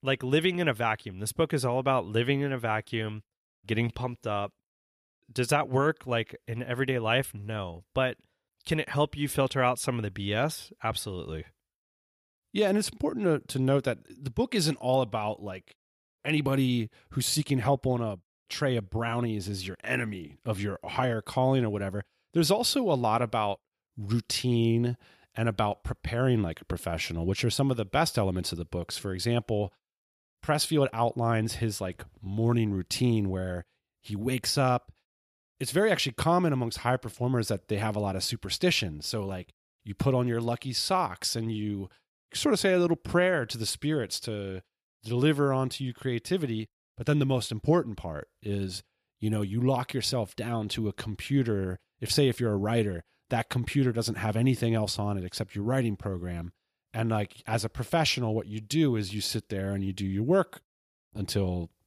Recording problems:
none

